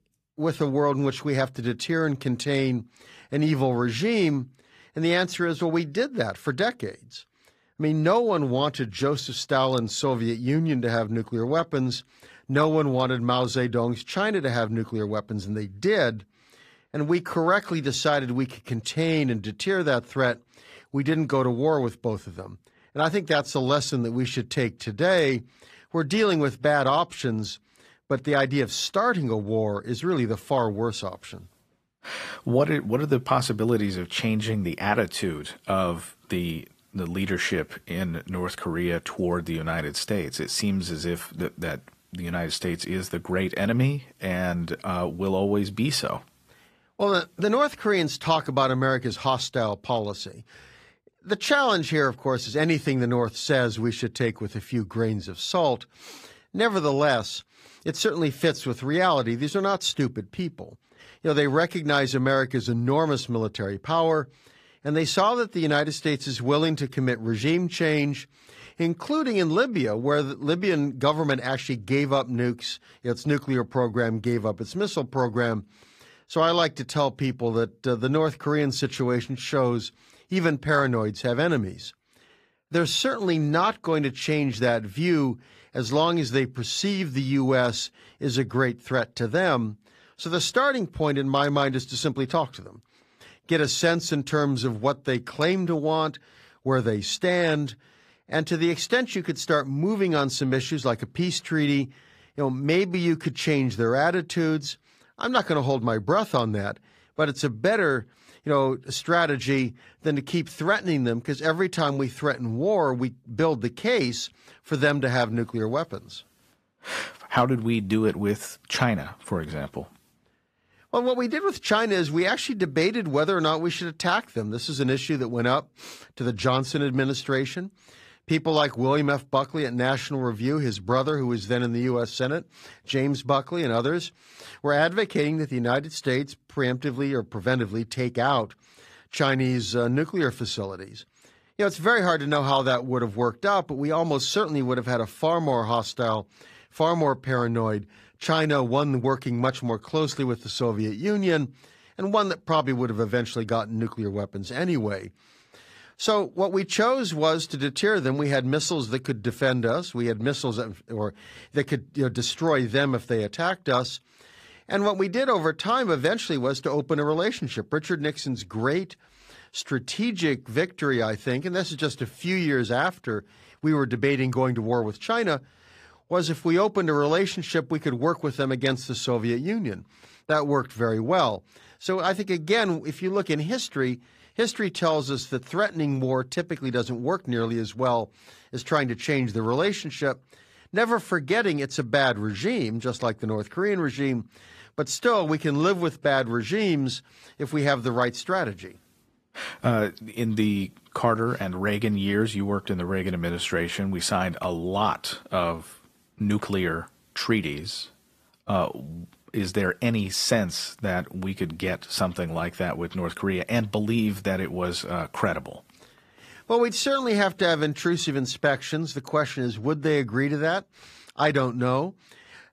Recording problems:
garbled, watery; slightly; nothing above 14.5 kHz

